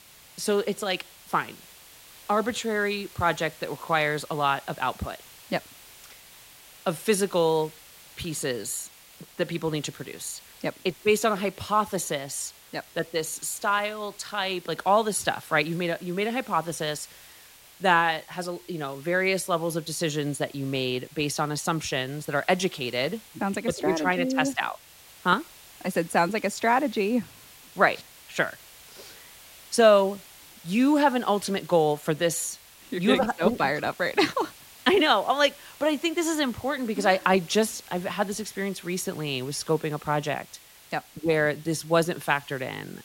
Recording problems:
hiss; faint; throughout; 20 dB below the speech

